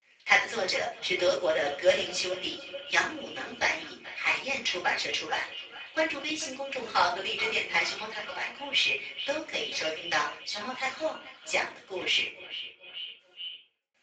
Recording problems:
echo of what is said; strong; throughout; 430 ms later, 10 dB below the speech
off-mic speech; far
garbled, watery; badly; nothing above 7.5 kHz
thin; very; fading below 500 Hz
room echo; slight; dies away in 0.4 s
uneven, jittery; slightly; from 1 to 12 s

